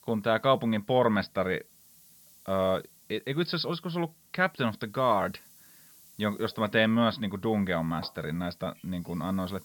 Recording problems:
high frequencies cut off; noticeable; nothing above 5.5 kHz
hiss; faint; throughout; 25 dB below the speech

